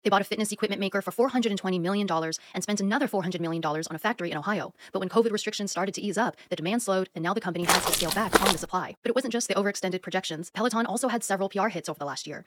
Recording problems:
wrong speed, natural pitch; too fast; 1.7 times normal speed
footsteps; loud; at 7.5 s; peak 6 dB above the speech

